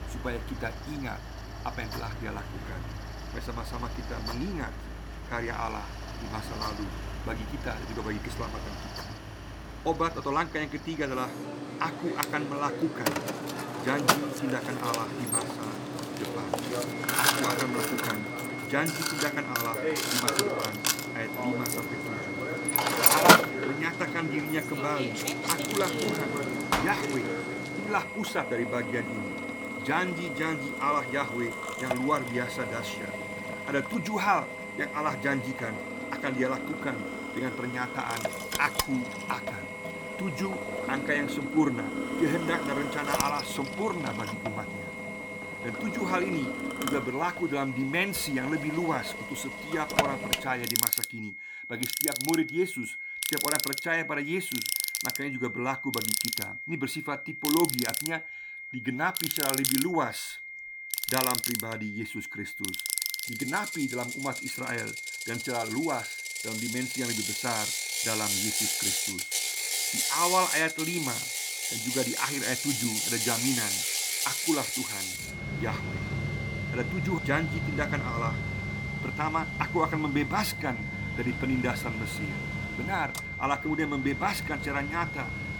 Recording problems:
machinery noise; very loud; throughout; 1 dB above the speech
high-pitched whine; loud; from 17 s on; 2 kHz, 6 dB below the speech

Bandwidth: 18 kHz